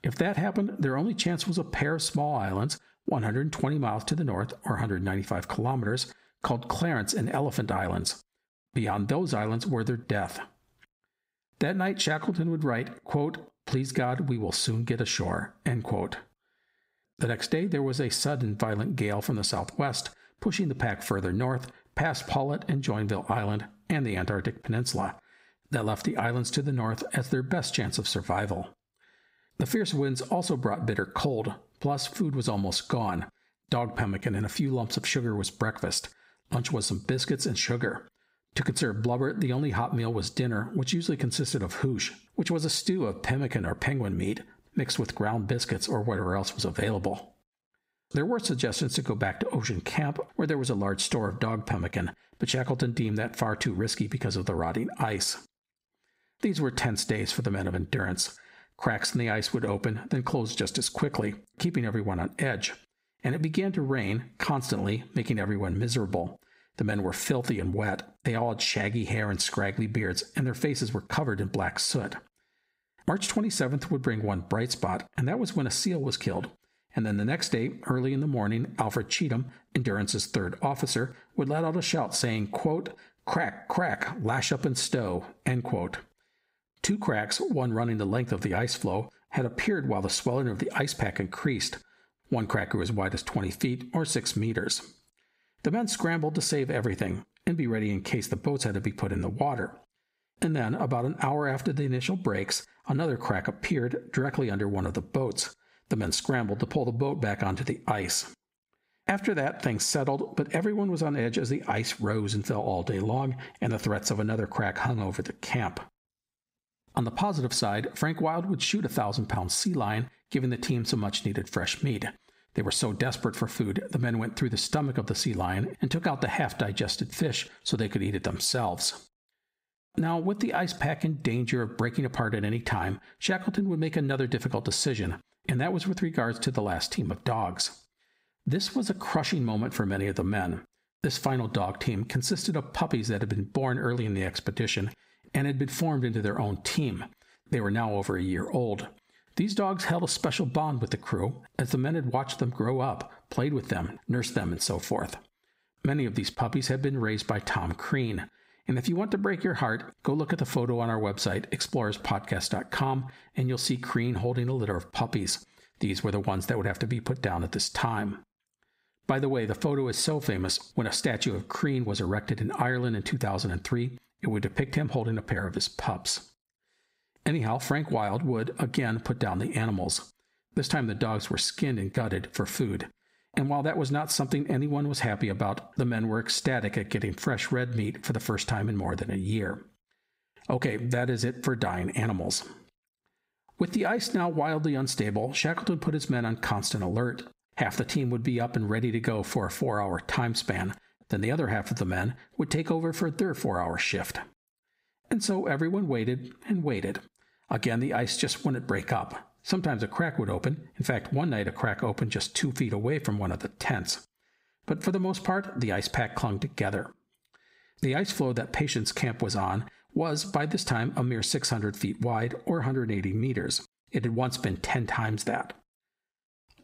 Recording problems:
squashed, flat; heavily

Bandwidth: 15.5 kHz